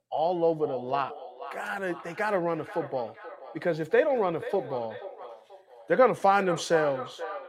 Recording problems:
echo of what is said; noticeable; throughout; 480 ms later, 15 dB below the speech

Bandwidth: 16.5 kHz